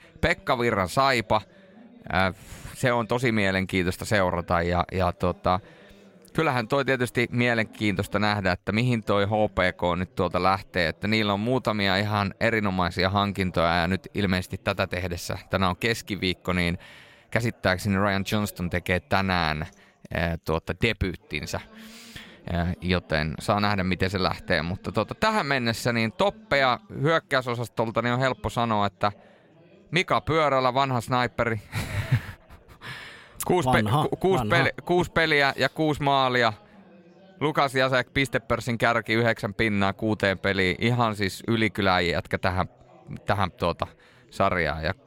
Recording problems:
background chatter; faint; throughout; 4 voices, 30 dB below the speech

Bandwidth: 16 kHz